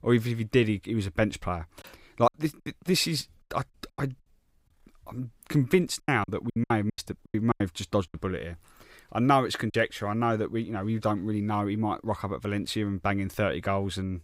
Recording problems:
choppy; very; from 2 to 4 s and from 6 to 9.5 s; 16% of the speech affected

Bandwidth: 15.5 kHz